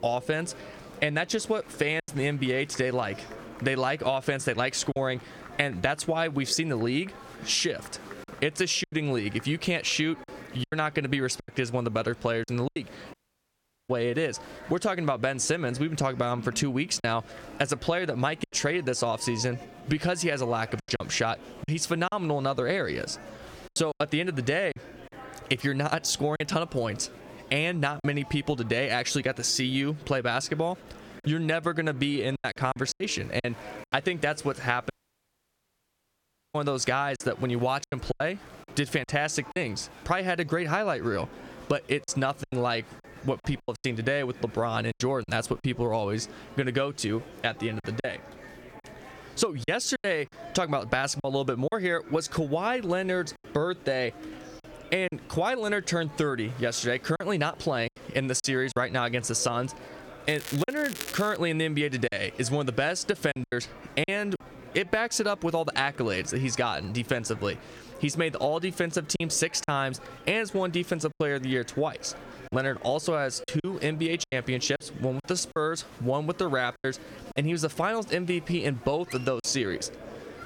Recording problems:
squashed, flat; somewhat, background pumping
murmuring crowd; noticeable; throughout; 20 dB below the speech
crackling; noticeable; from 1:00 to 1:01; 10 dB below the speech
choppy; very; 5% of the speech affected
audio cutting out; at 13 s for 1 s and at 35 s for 1.5 s

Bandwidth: 17.5 kHz